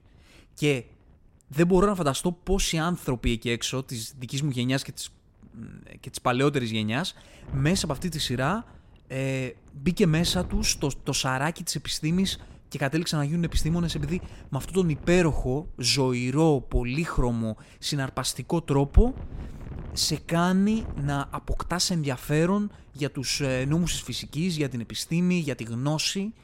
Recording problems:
wind noise on the microphone; occasional gusts; 25 dB below the speech

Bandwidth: 16 kHz